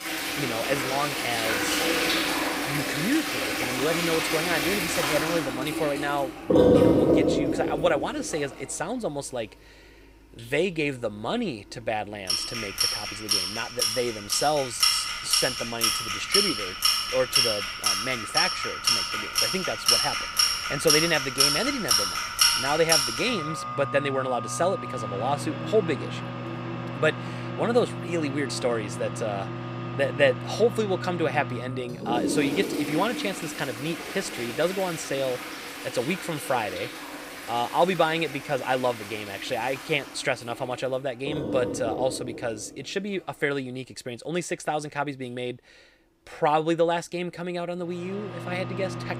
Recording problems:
household noises; very loud; throughout; 2 dB above the speech

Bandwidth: 15.5 kHz